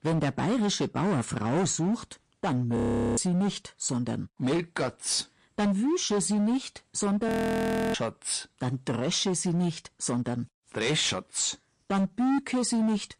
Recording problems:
distortion; heavy; 16% of the sound clipped
garbled, watery; slightly; nothing above 15.5 kHz
audio freezing; at 3 s and at 7.5 s for 0.5 s

